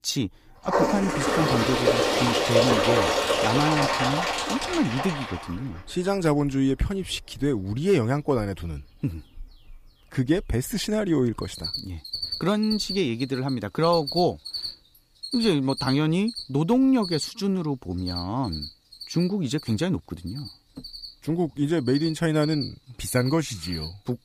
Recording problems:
animal sounds; loud; throughout; 1 dB below the speech

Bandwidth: 15 kHz